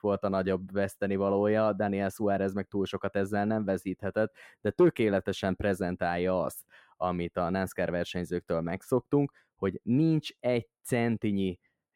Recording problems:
muffled; slightly; fading above 2.5 kHz

